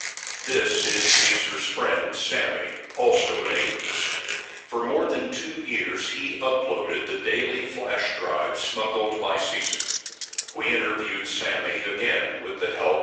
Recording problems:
off-mic speech; far
thin; very; fading below 450 Hz
room echo; noticeable; dies away in 1 s
garbled, watery; slightly; nothing above 7.5 kHz
household noises; very loud; until 4.5 s; as loud as the speech
jangling keys; noticeable; at 9.5 s; peak 1 dB below the speech

